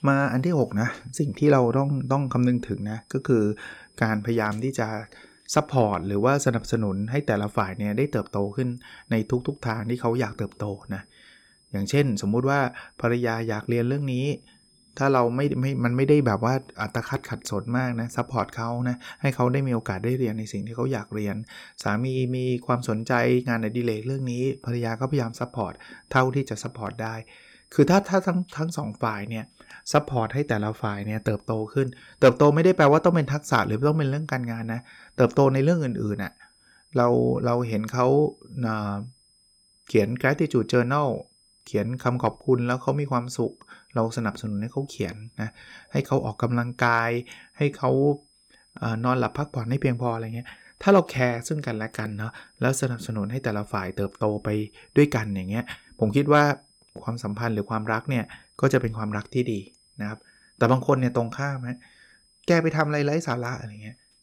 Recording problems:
high-pitched whine; faint; throughout; 5 kHz, 35 dB below the speech

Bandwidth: 17.5 kHz